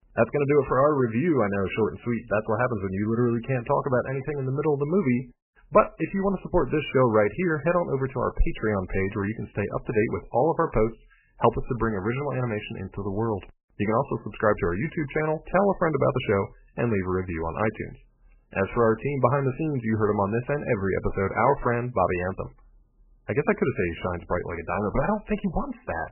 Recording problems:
garbled, watery; badly; nothing above 3 kHz

